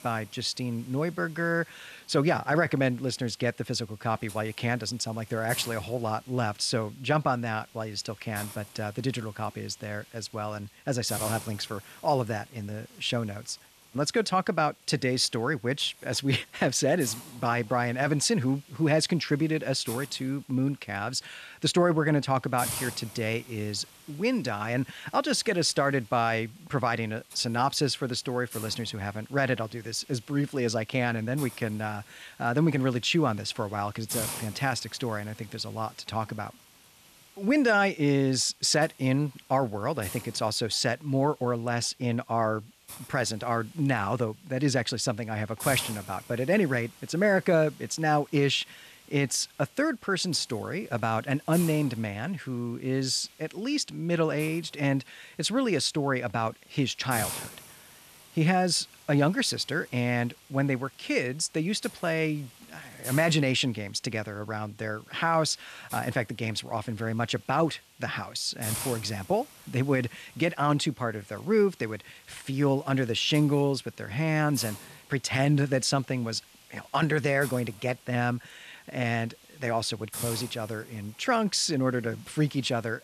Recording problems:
hiss; noticeable; throughout; 15 dB below the speech

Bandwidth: 14 kHz